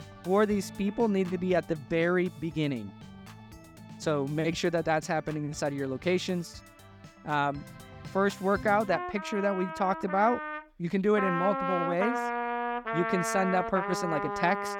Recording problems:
background music; loud; throughout; 5 dB below the speech

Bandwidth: 18 kHz